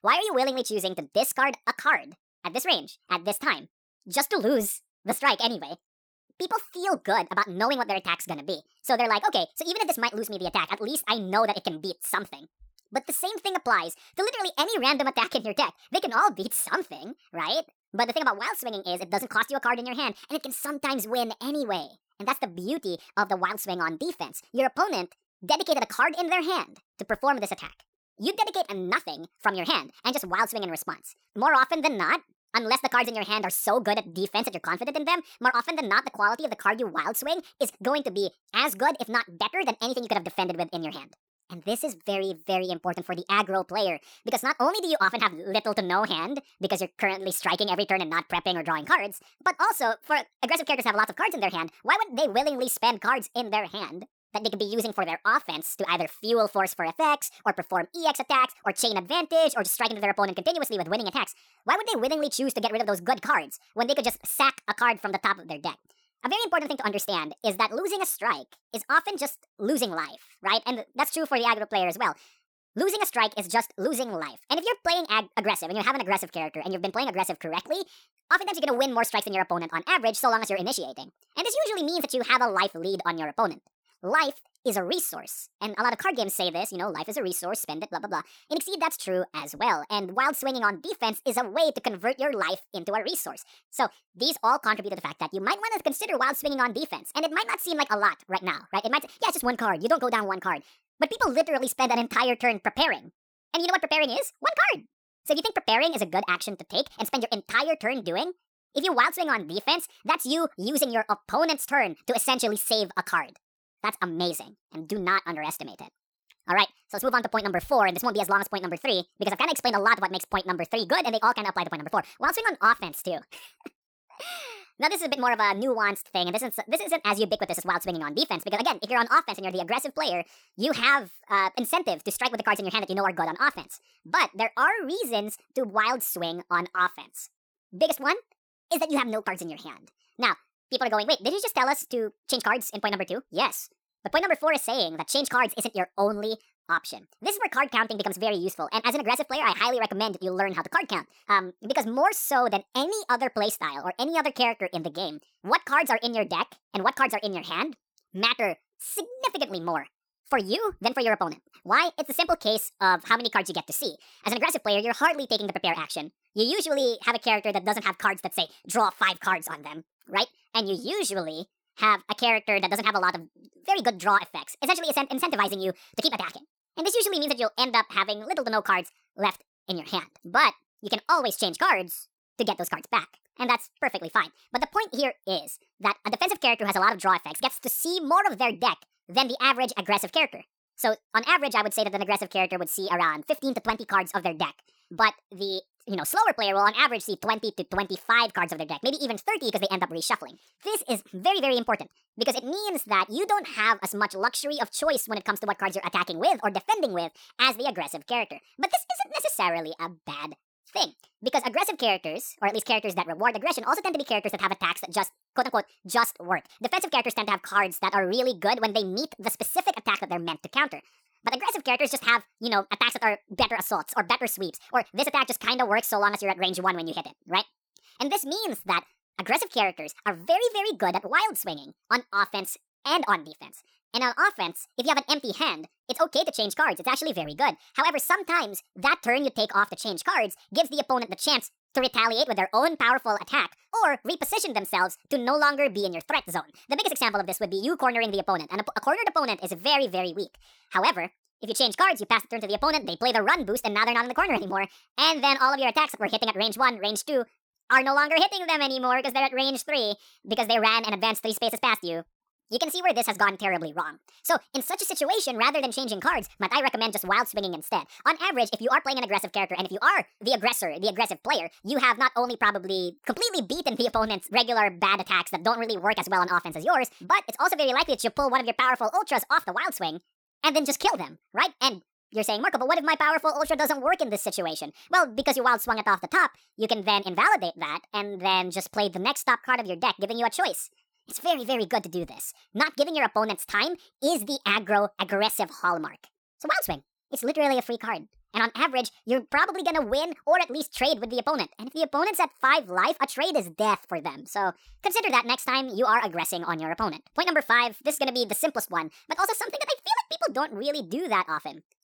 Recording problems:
wrong speed and pitch; too fast and too high; 1.5 times normal speed

